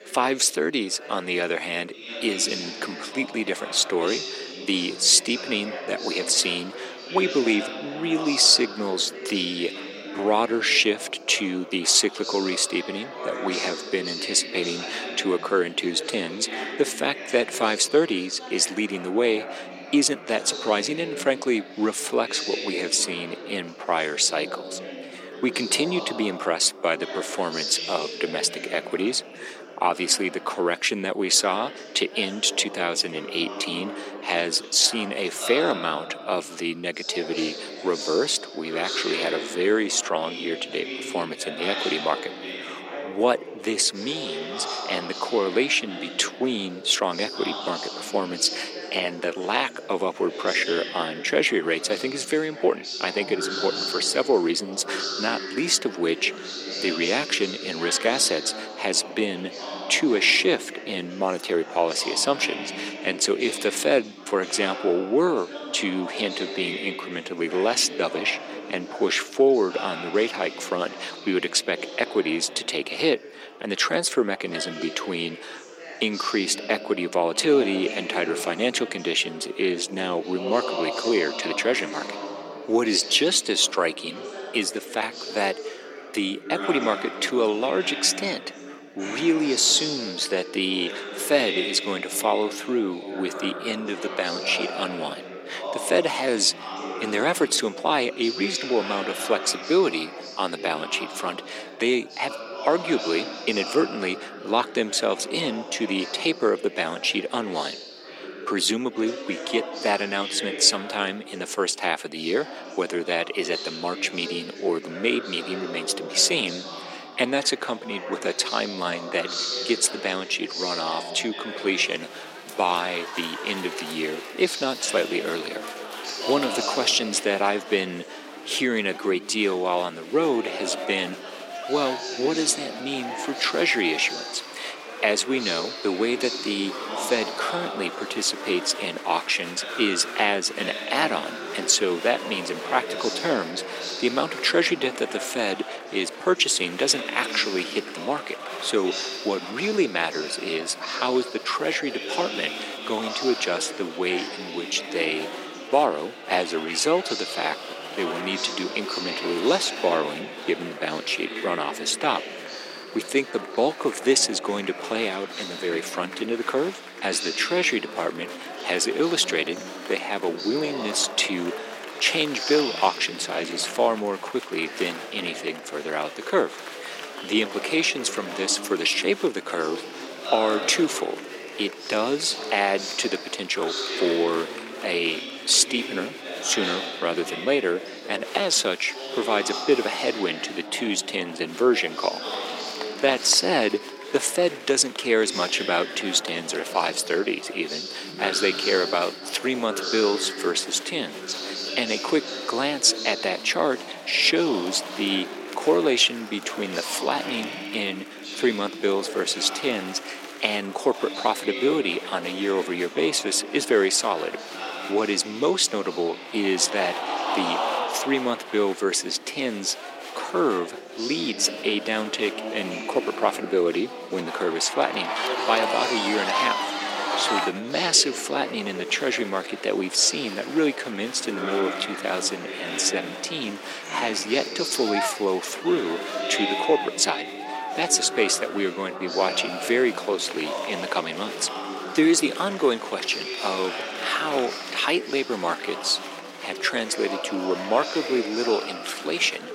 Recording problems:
thin; somewhat; fading below 300 Hz
chatter from many people; loud; throughout; 8 dB below the speech

